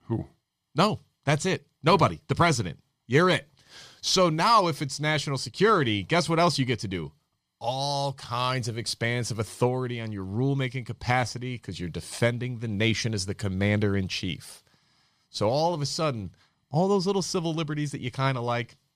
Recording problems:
none

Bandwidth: 14.5 kHz